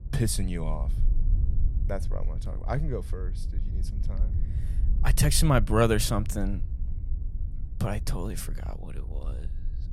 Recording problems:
low rumble; faint; throughout; 20 dB below the speech

